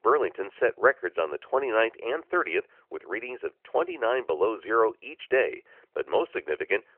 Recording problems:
phone-call audio; nothing above 3 kHz

